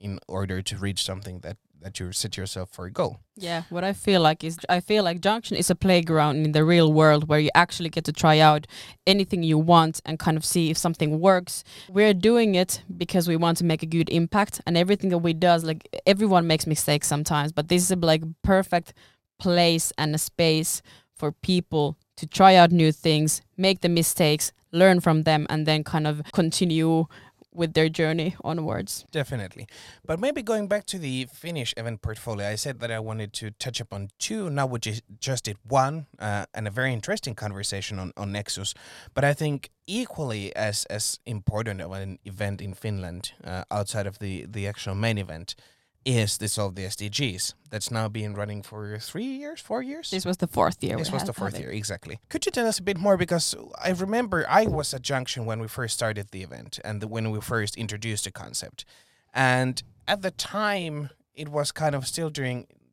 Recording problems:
none

